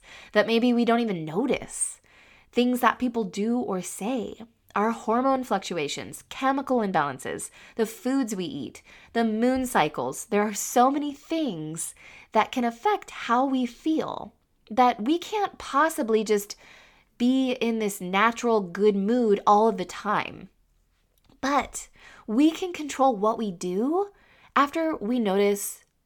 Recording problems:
none

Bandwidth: 18.5 kHz